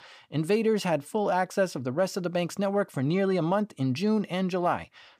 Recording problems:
none

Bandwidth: 15 kHz